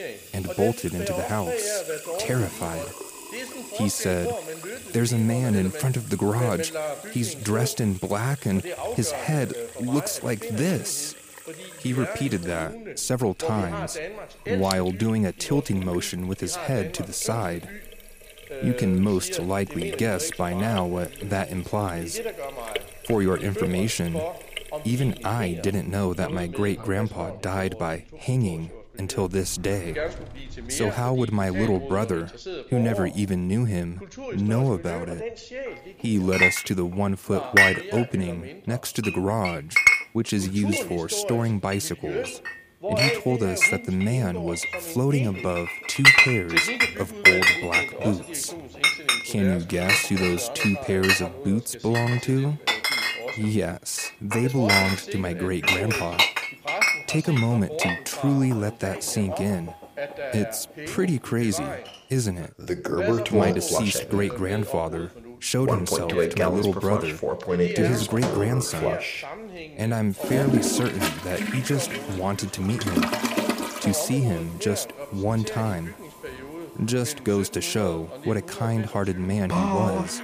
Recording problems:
household noises; very loud; throughout; 2 dB above the speech
voice in the background; loud; throughout; 9 dB below the speech

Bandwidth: 15 kHz